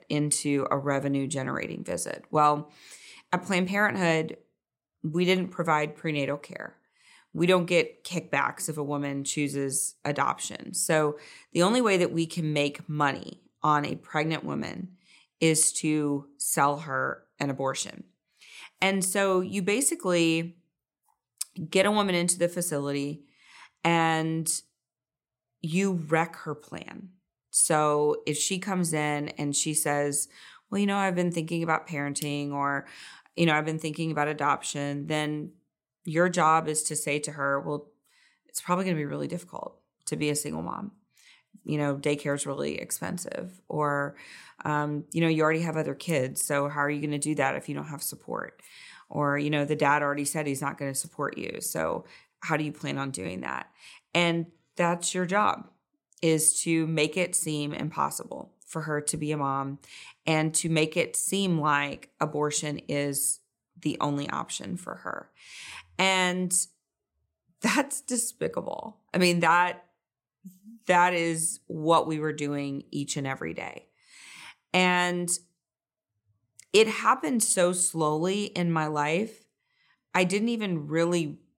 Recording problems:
none

